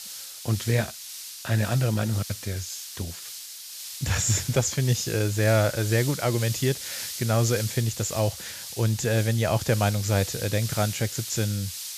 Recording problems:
high frequencies cut off; noticeable; nothing above 8 kHz
hiss; loud; throughout; 9 dB below the speech

